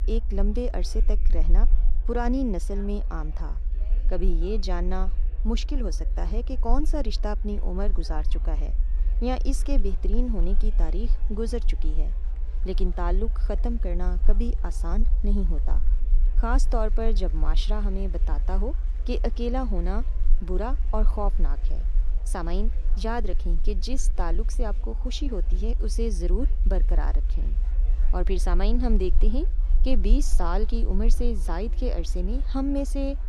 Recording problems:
low rumble; noticeable; throughout; 20 dB below the speech
murmuring crowd; faint; throughout; 25 dB below the speech

